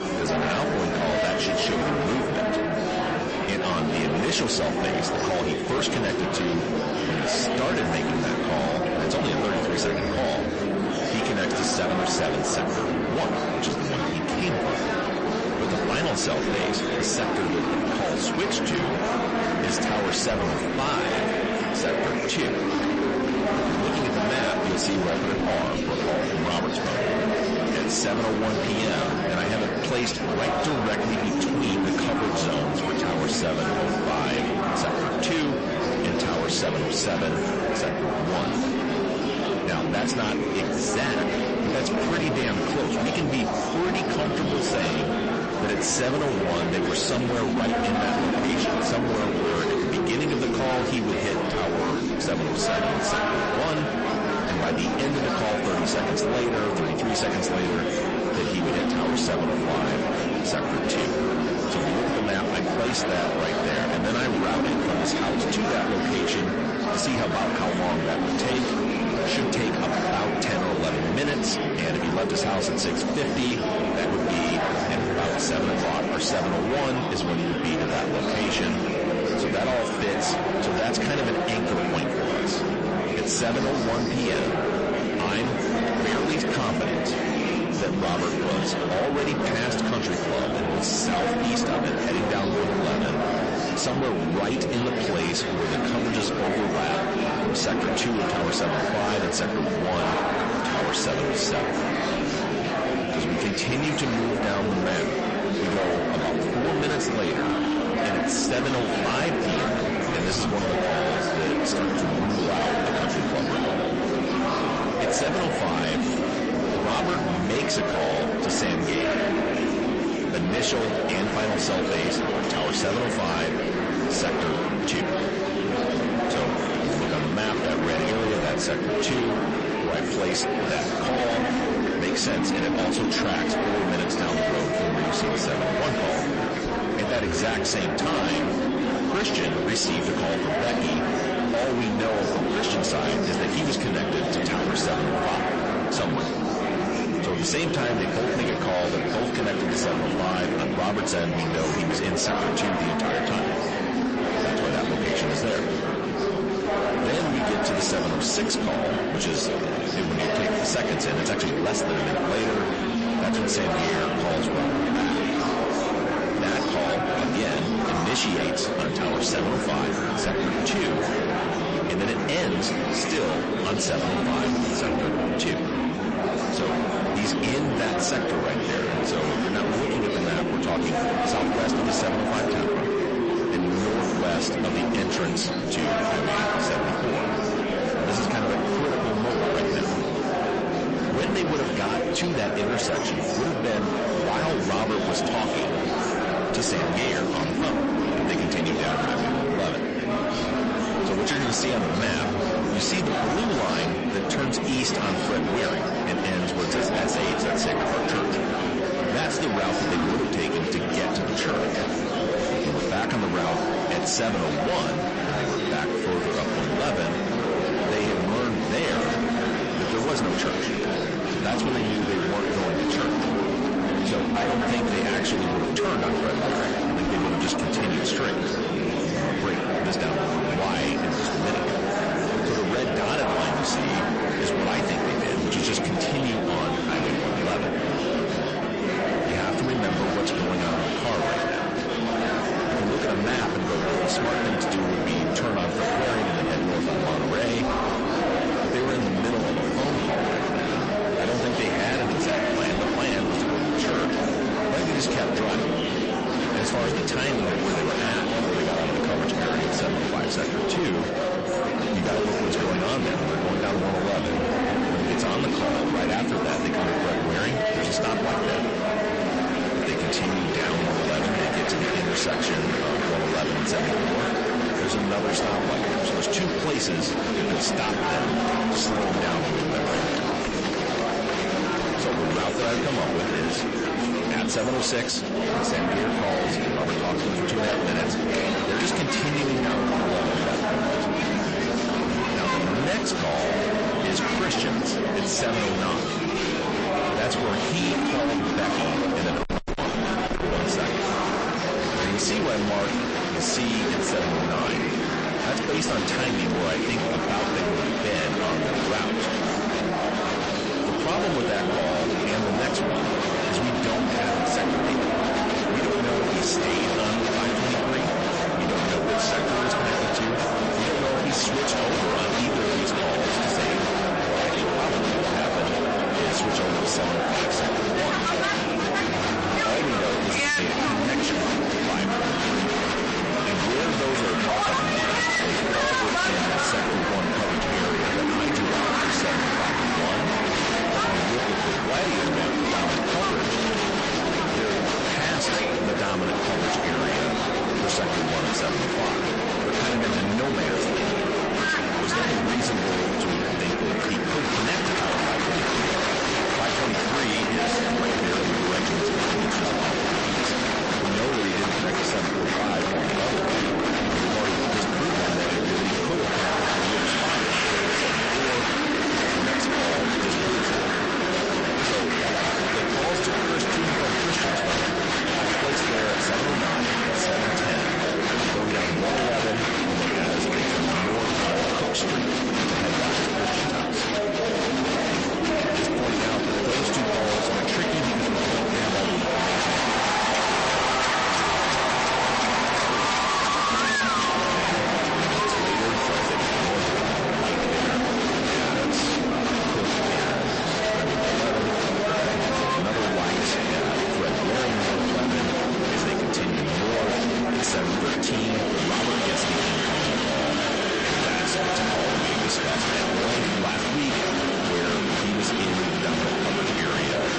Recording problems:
distortion; heavy; 37% of the sound clipped
garbled, watery; slightly; nothing above 8 kHz
murmuring crowd; very loud; throughout; 2 dB above the speech
crackling; very faint; 4 times, first at 4:28; 25 dB below the speech

